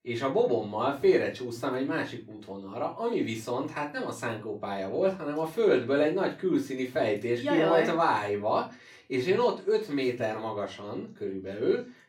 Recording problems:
off-mic speech; far
room echo; very slight; dies away in 0.3 s

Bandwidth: 17 kHz